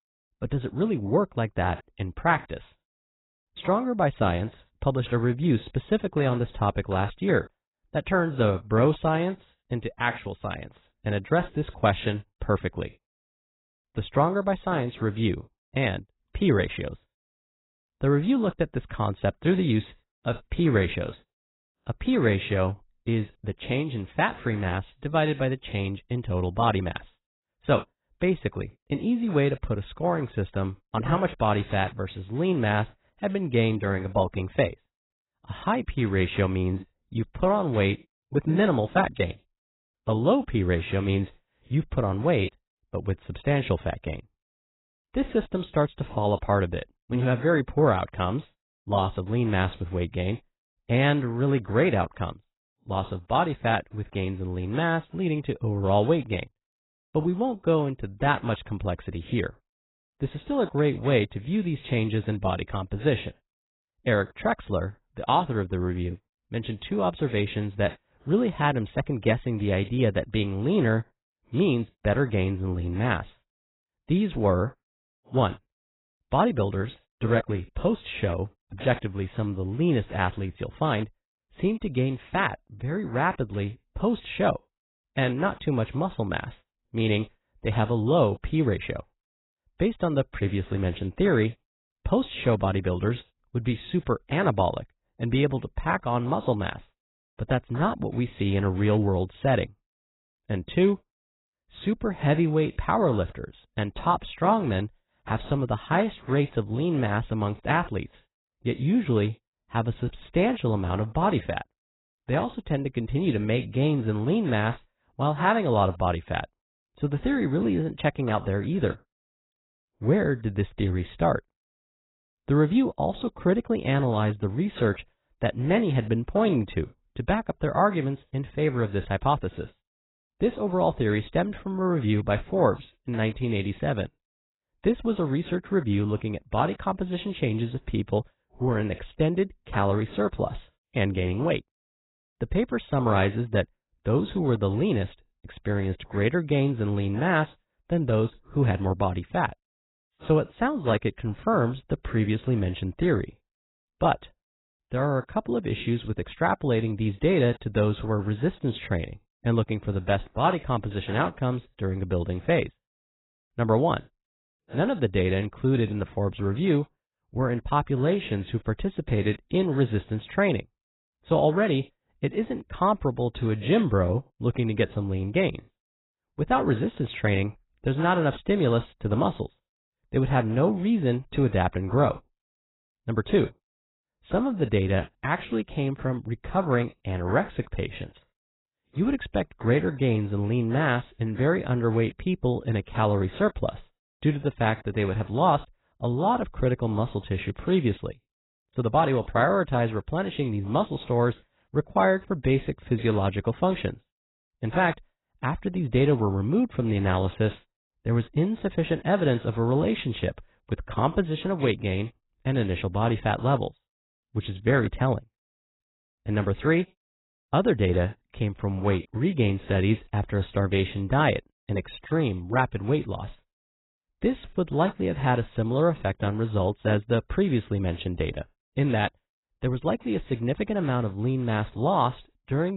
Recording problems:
garbled, watery; badly; nothing above 4 kHz
abrupt cut into speech; at the end

